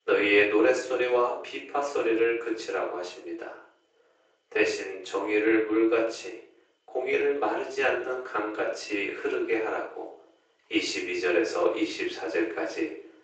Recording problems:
off-mic speech; far
thin; very; fading below 350 Hz
room echo; noticeable; dies away in 0.5 s
garbled, watery; slightly; nothing above 7.5 kHz

